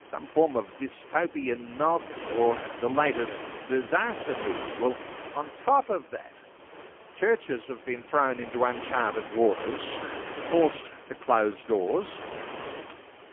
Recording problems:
phone-call audio; poor line; nothing above 3.5 kHz
wind noise on the microphone; occasional gusts; 10 dB below the speech

